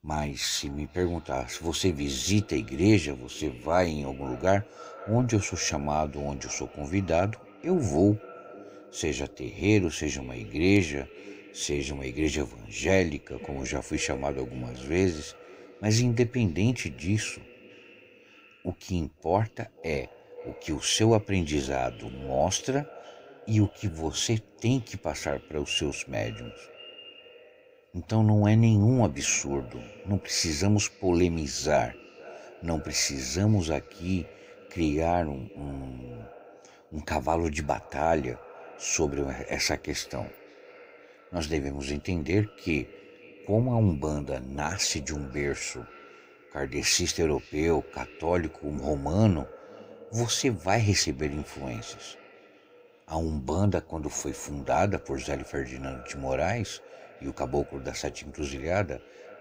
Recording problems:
echo of what is said; faint; throughout; 520 ms later, 20 dB below the speech

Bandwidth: 15.5 kHz